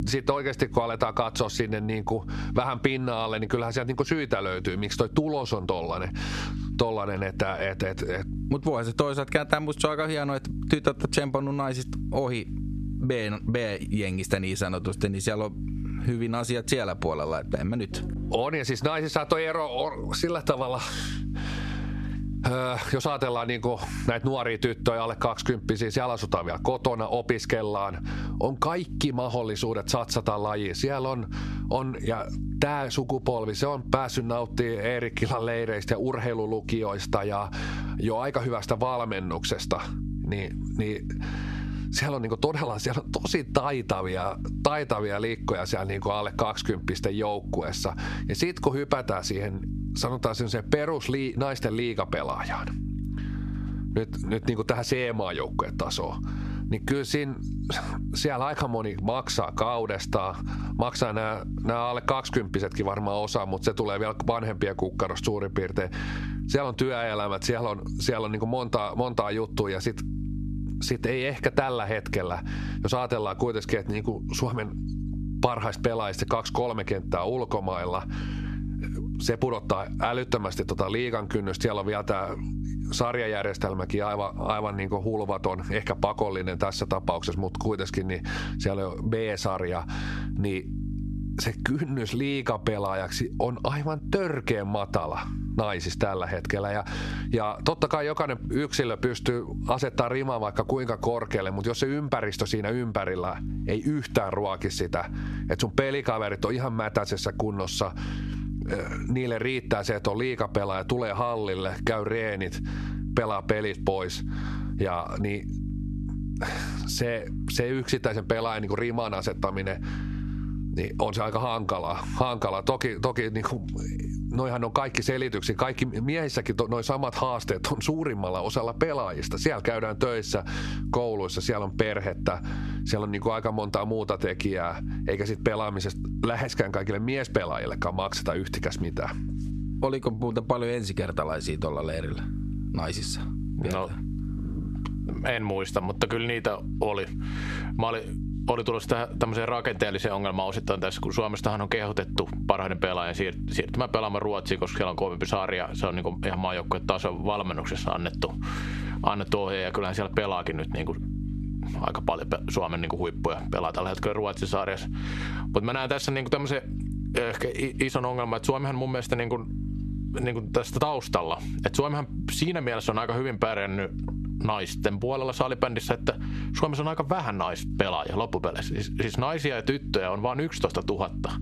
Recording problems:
squashed, flat; heavily
electrical hum; noticeable; throughout; 50 Hz, 15 dB below the speech

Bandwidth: 13.5 kHz